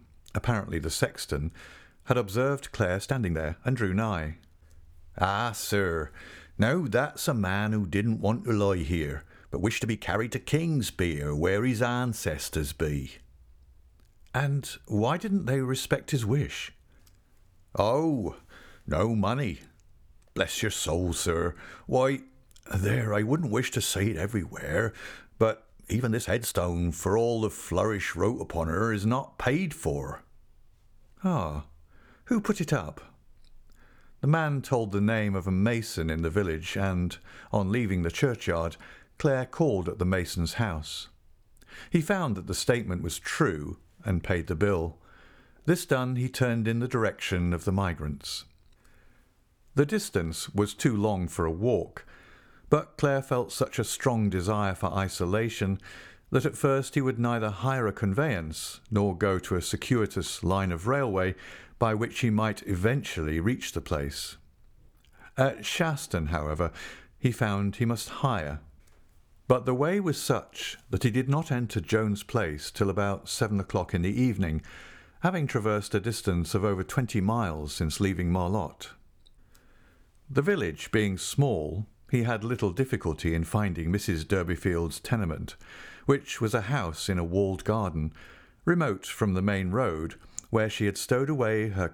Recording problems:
uneven, jittery; strongly; from 3 s to 1:06

